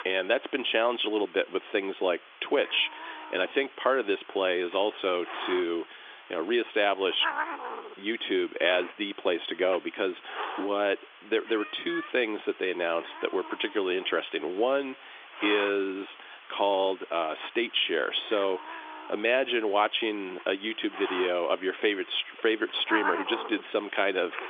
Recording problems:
phone-call audio; nothing above 3.5 kHz
hiss; noticeable; throughout; 10 dB below the speech

